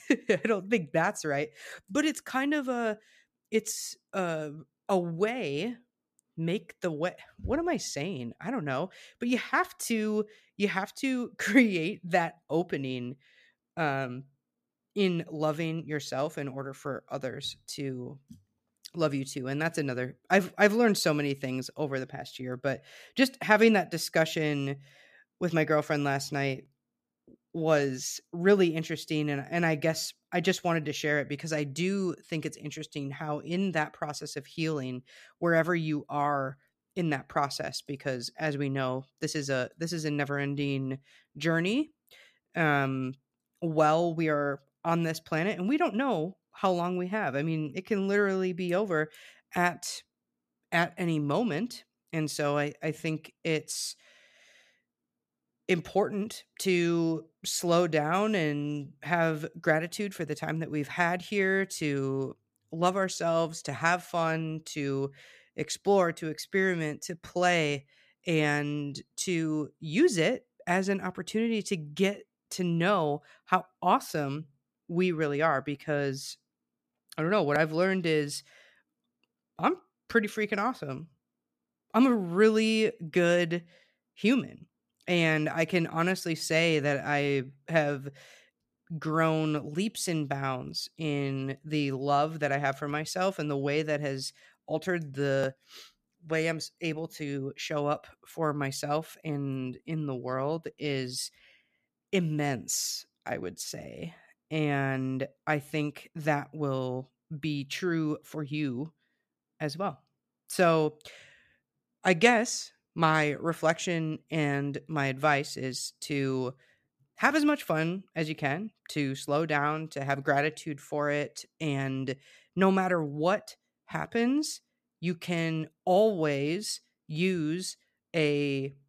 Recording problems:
none

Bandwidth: 14.5 kHz